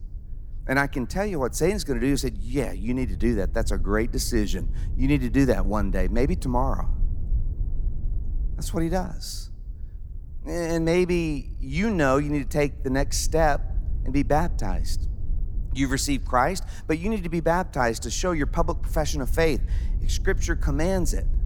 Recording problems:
low rumble; faint; throughout; 25 dB below the speech

